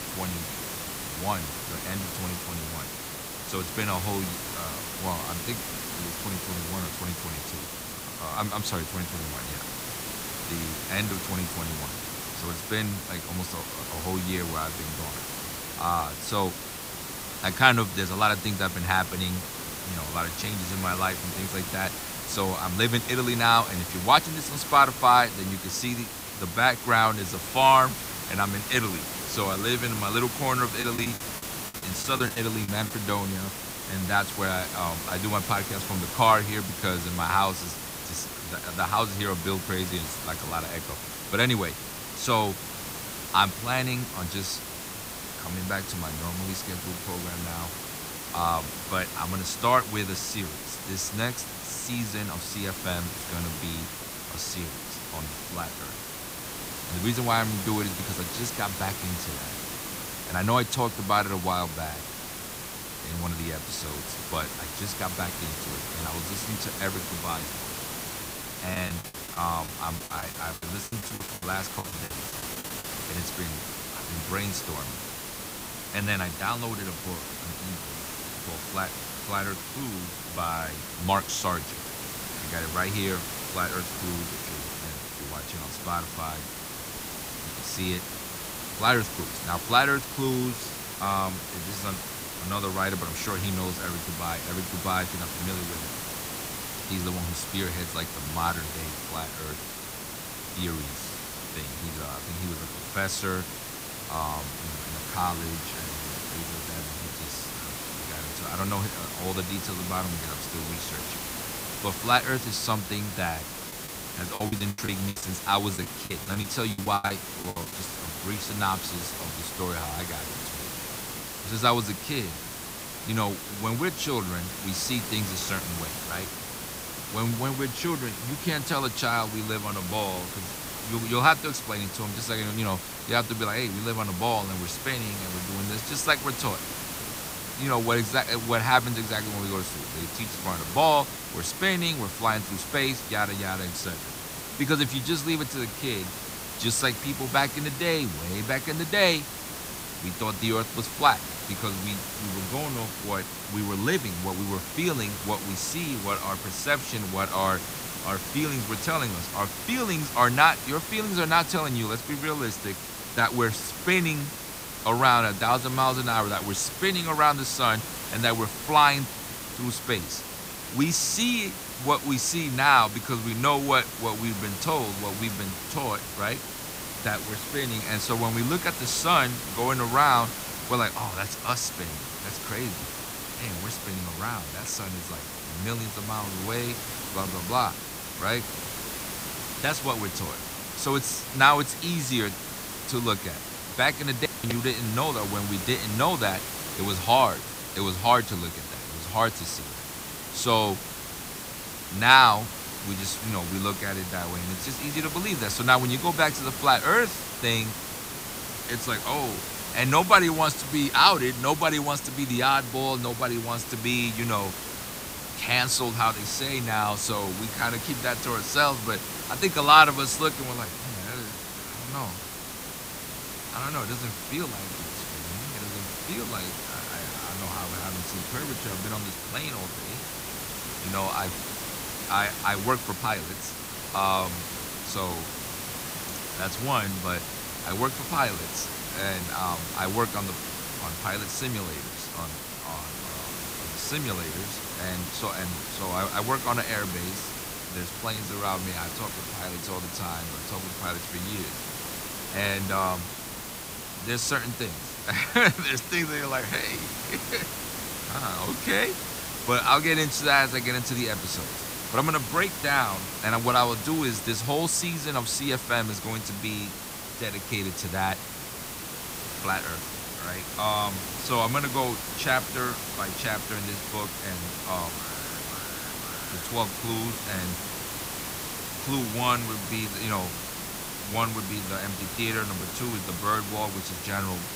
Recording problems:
hiss; loud; throughout; 6 dB below the speech
choppy; very; from 31 to 33 s, from 1:09 to 1:12 and from 1:54 to 1:58; 18% of the speech affected
alarm; faint; from 4:35 to 4:36; peak 15 dB below the speech

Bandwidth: 15.5 kHz